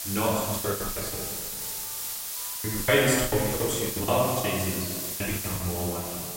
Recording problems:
off-mic speech; far
room echo; noticeable; dies away in 1.7 s
hiss; loud; throughout; 4 dB below the speech
alarms or sirens; faint; throughout; 25 dB below the speech
choppy; very; 20% of the speech affected

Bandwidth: 16 kHz